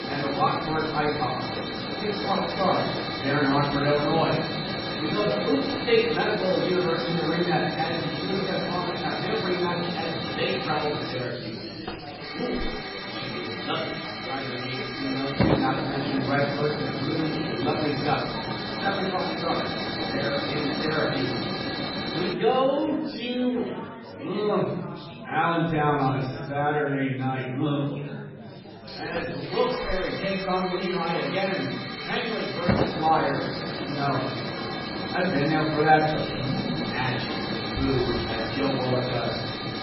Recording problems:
off-mic speech; far
garbled, watery; badly; nothing above 5.5 kHz
room echo; noticeable; dies away in 1 s
hiss; loud; until 22 s and from 29 s on; 3 dB below the speech
chatter from many people; noticeable; throughout; 10 dB below the speech

